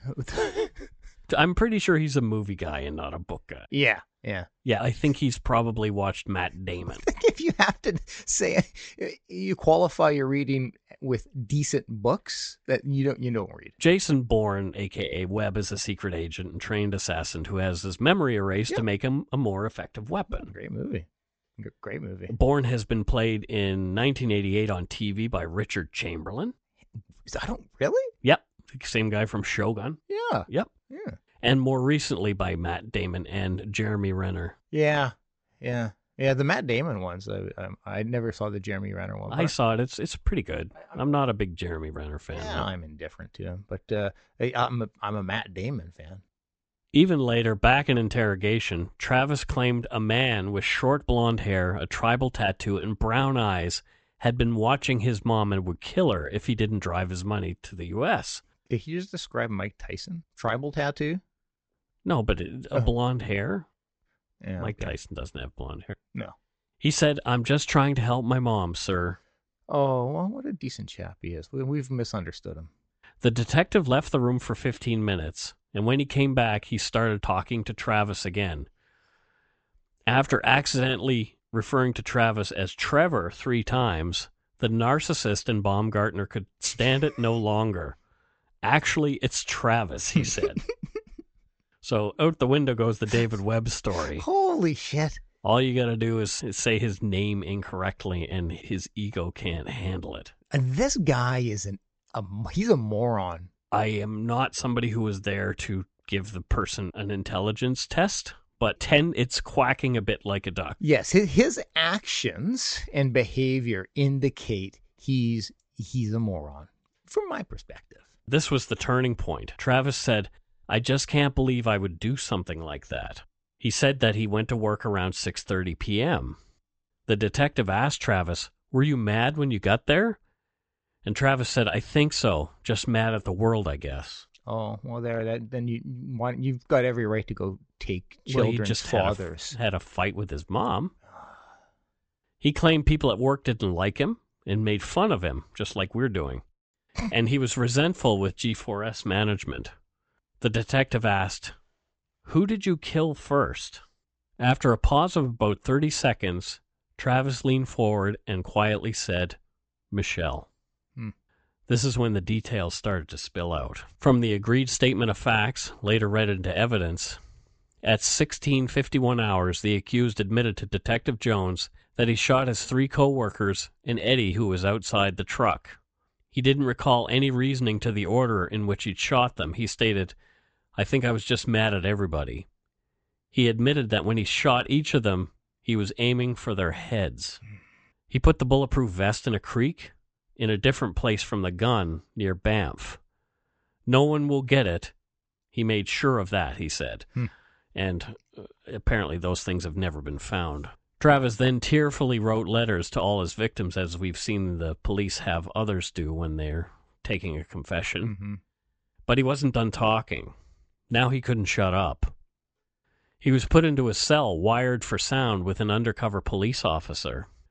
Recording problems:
high frequencies cut off; noticeable; nothing above 8 kHz

